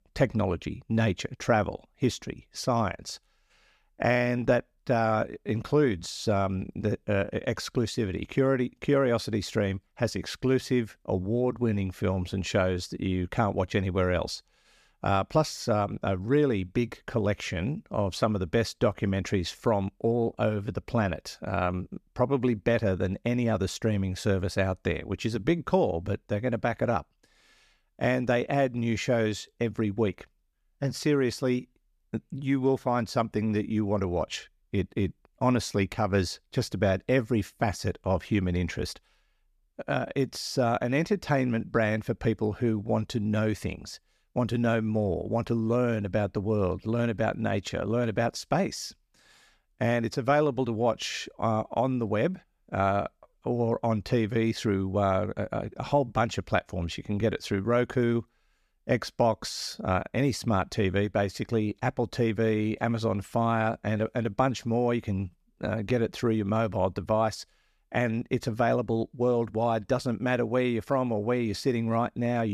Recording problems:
abrupt cut into speech; at the end

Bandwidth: 14.5 kHz